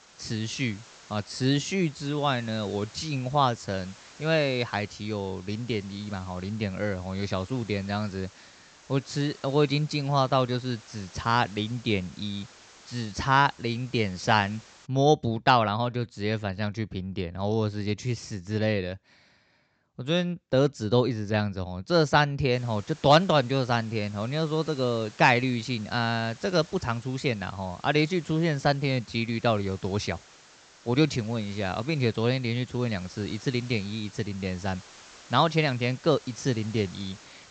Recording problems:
high frequencies cut off; noticeable; nothing above 8 kHz
hiss; faint; until 15 s and from 23 s on; 25 dB below the speech

